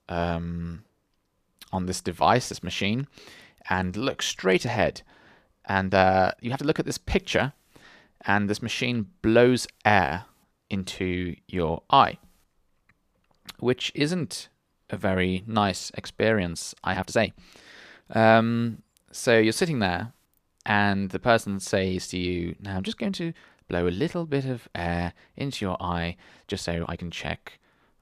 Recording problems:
uneven, jittery; strongly; from 3.5 to 27 s

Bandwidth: 14.5 kHz